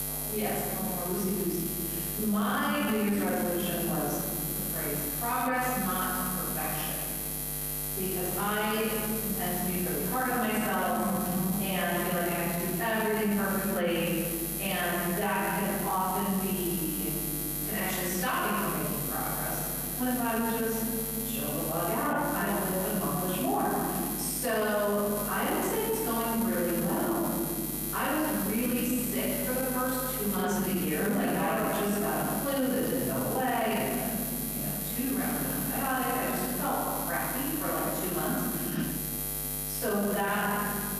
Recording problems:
room echo; strong; dies away in 2.2 s
off-mic speech; far
squashed, flat; somewhat
electrical hum; loud; throughout; 60 Hz, 8 dB below the speech

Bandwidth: 14.5 kHz